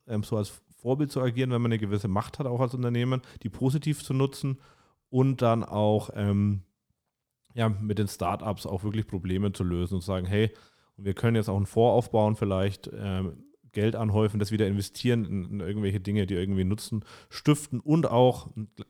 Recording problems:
none

